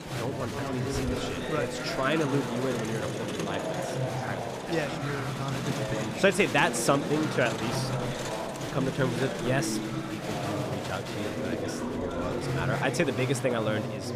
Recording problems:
chatter from many people; loud; throughout; 2 dB below the speech

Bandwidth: 15 kHz